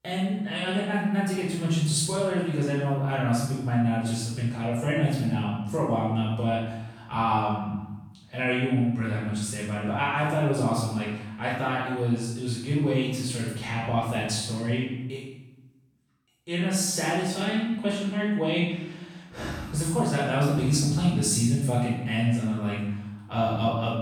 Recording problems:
room echo; strong; dies away in 0.9 s
off-mic speech; far

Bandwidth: 18 kHz